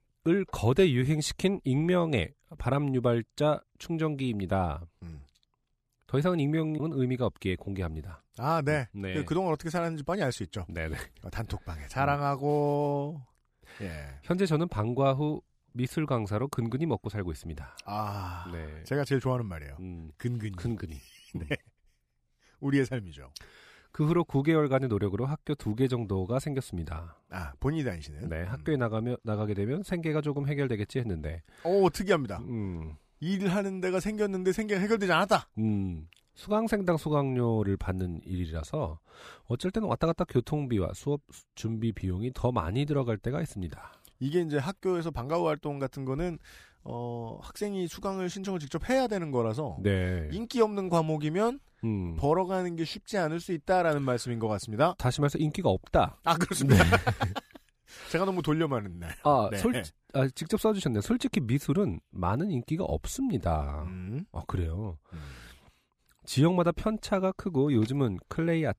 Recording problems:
none

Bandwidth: 15 kHz